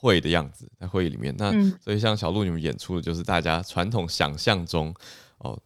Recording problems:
none

